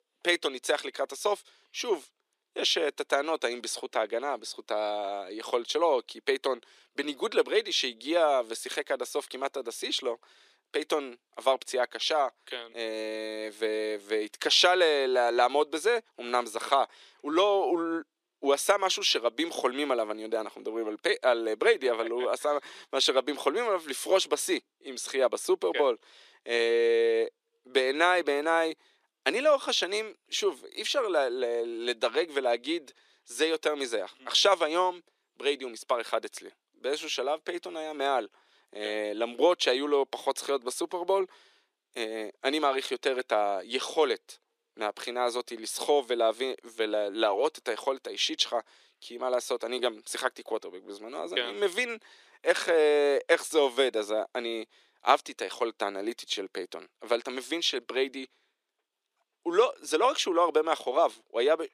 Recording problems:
thin; very; fading below 300 Hz

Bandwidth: 14.5 kHz